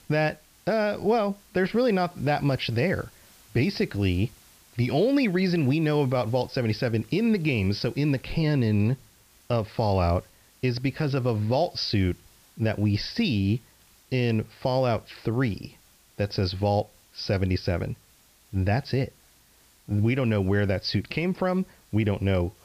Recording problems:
high frequencies cut off; noticeable; nothing above 5.5 kHz
hiss; faint; throughout; 30 dB below the speech

